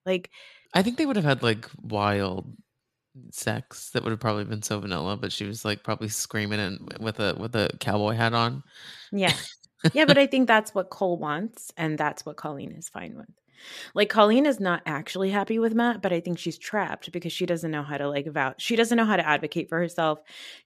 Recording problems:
none

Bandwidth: 14.5 kHz